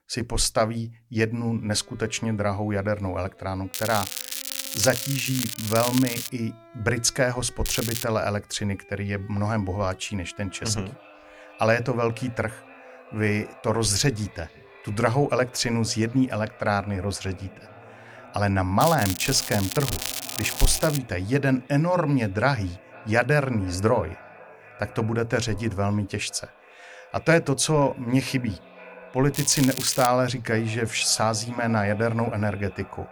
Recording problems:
echo of what is said; faint; from 10 s on; 490 ms later, 20 dB below the speech
crackling; loud; 4 times, first at 3.5 s; 5 dB below the speech
background music; faint; throughout; 25 dB below the speech

